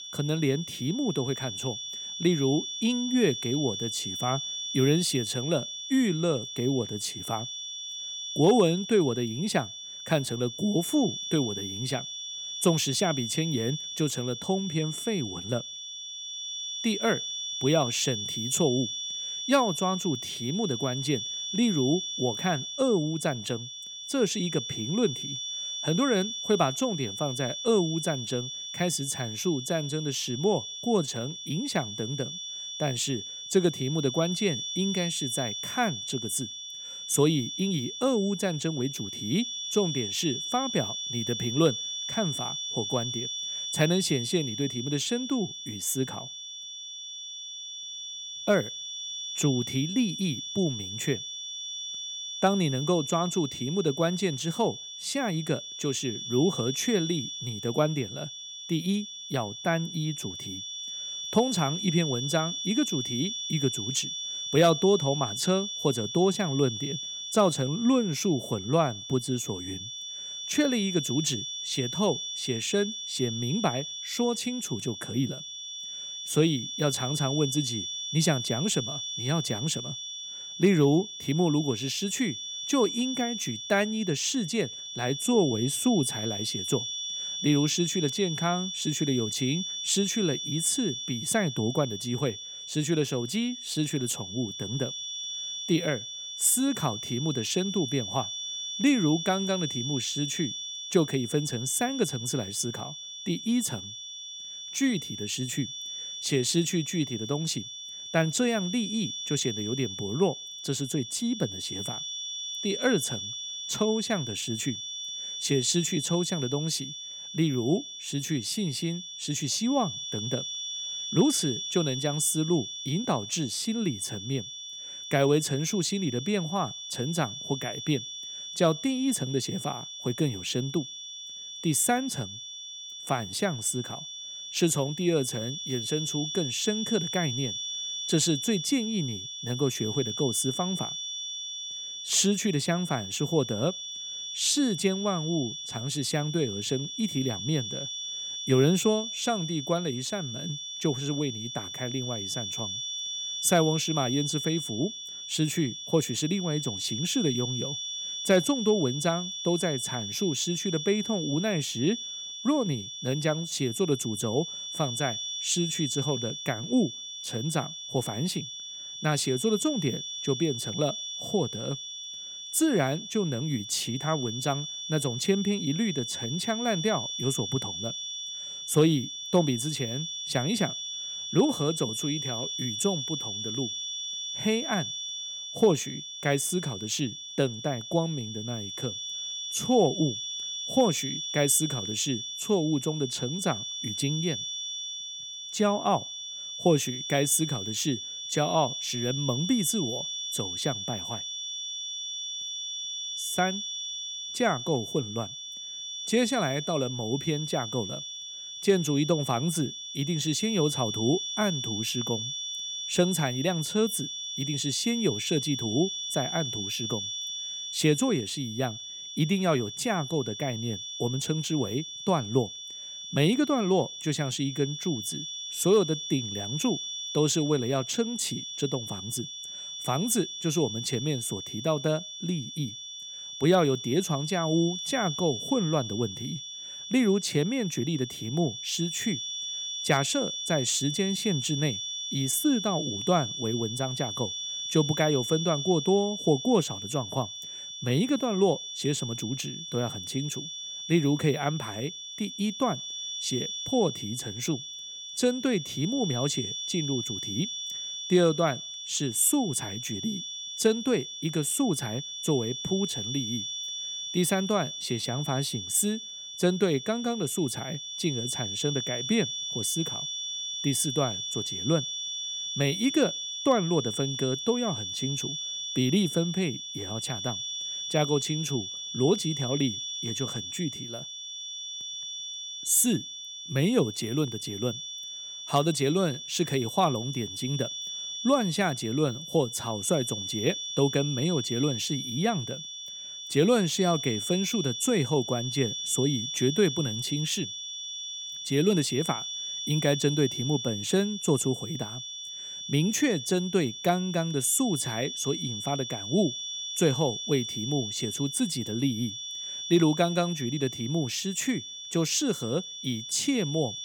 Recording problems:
high-pitched whine; loud; throughout; 3.5 kHz, 5 dB below the speech

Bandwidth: 17 kHz